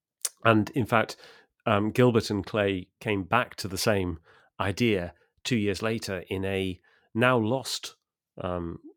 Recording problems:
none

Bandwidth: 17.5 kHz